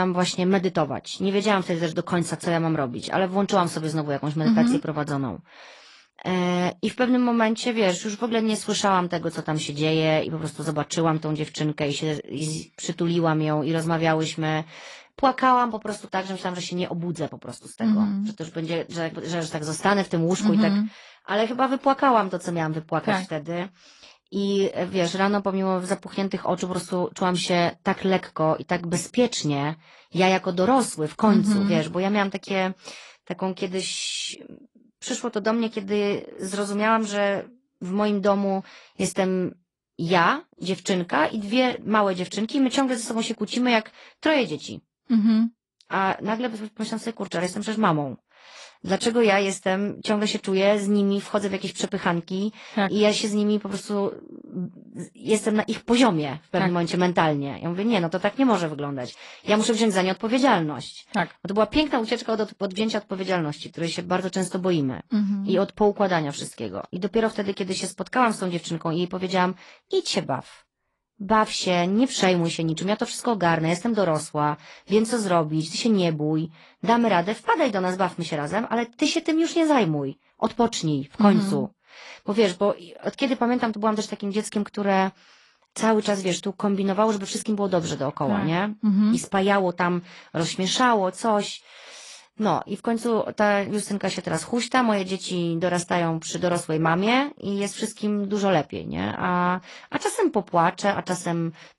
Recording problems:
garbled, watery; slightly
abrupt cut into speech; at the start

